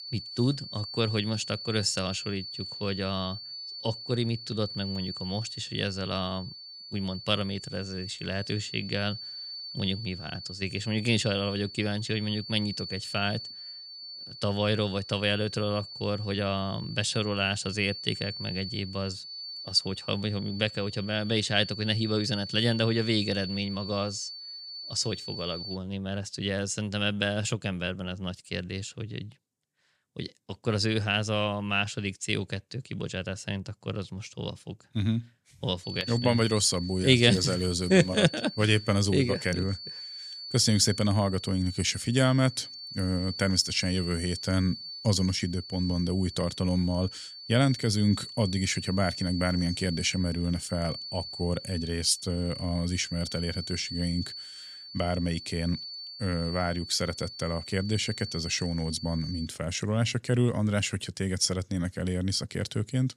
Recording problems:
high-pitched whine; loud; until 26 s and from 36 to 59 s; 4.5 kHz, 10 dB below the speech

